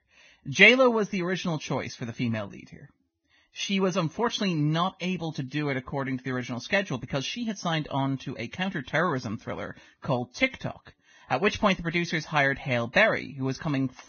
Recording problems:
garbled, watery; badly; nothing above 6.5 kHz

